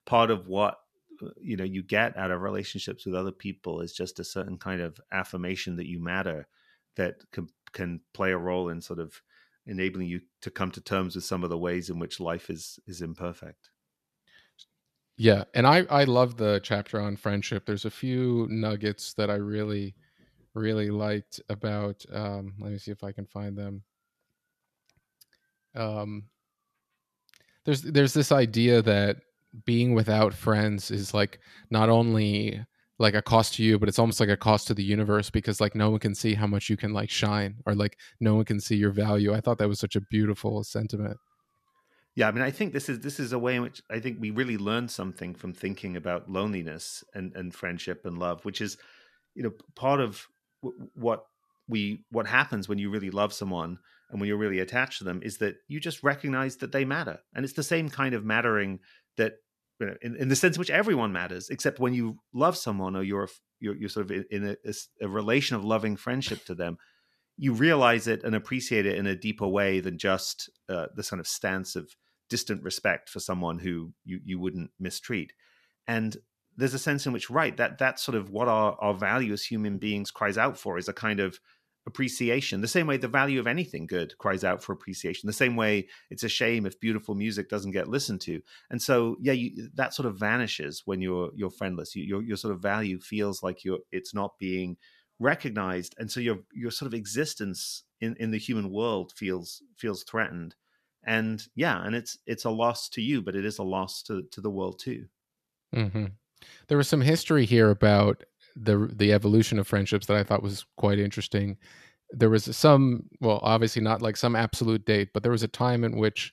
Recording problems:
none

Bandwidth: 14.5 kHz